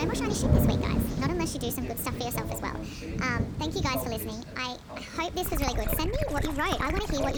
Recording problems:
wrong speed and pitch; too fast and too high; 1.5 times normal speed
rain or running water; very loud; throughout; as loud as the speech
voice in the background; loud; throughout; 8 dB below the speech
abrupt cut into speech; at the start and the end

